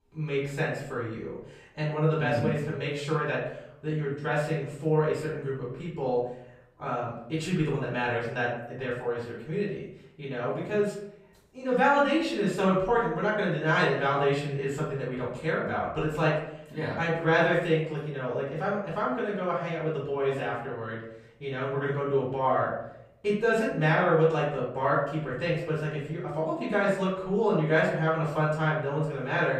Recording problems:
off-mic speech; far
room echo; noticeable; dies away in 0.7 s

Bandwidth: 15.5 kHz